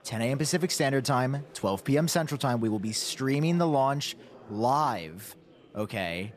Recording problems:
chatter from many people; faint; throughout; 25 dB below the speech

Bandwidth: 14.5 kHz